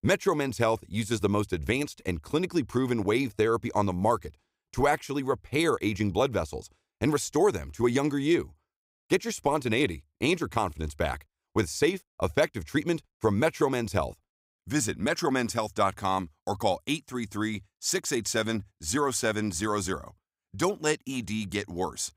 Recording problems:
none

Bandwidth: 15.5 kHz